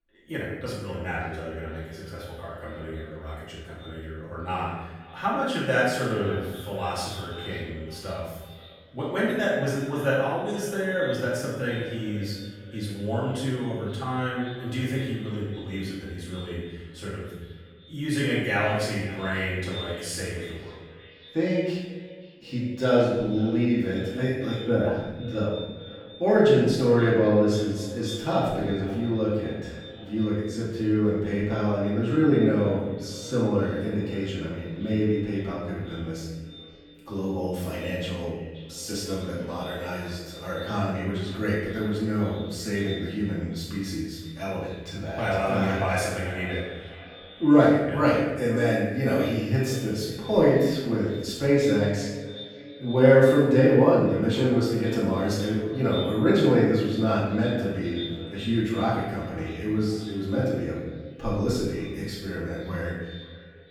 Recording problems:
off-mic speech; far
echo of what is said; noticeable; throughout; 530 ms later, 15 dB below the speech
room echo; noticeable; dies away in 1 s

